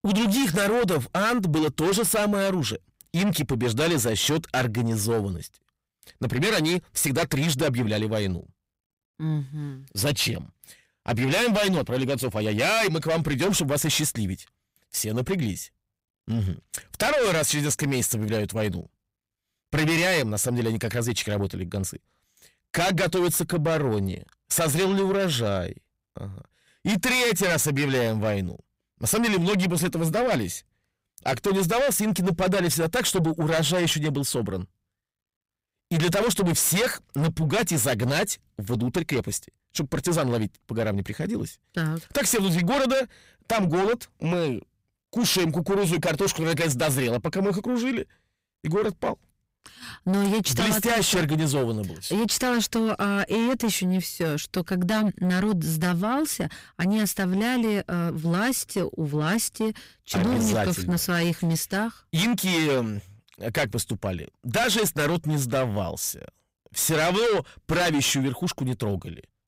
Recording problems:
distortion; heavy; 7 dB below the speech

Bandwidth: 15.5 kHz